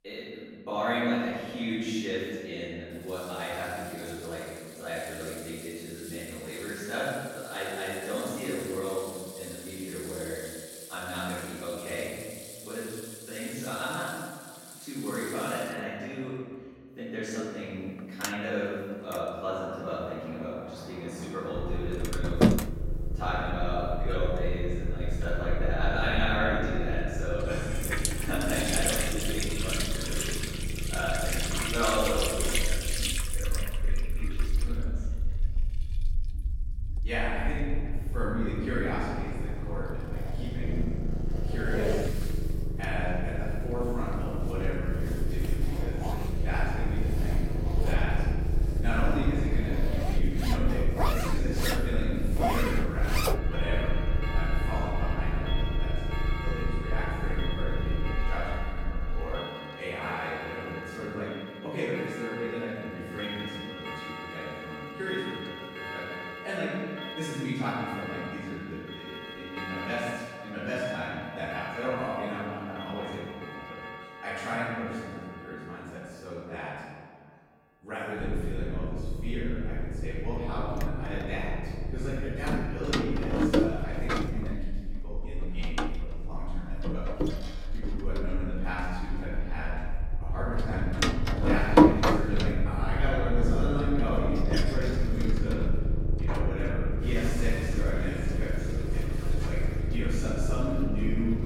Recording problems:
room echo; strong; dies away in 1.6 s
off-mic speech; far
household noises; loud; throughout; as loud as the speech
low rumble; loud; from 22 to 59 s and from 1:18 on; 9 dB below the speech

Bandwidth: 16.5 kHz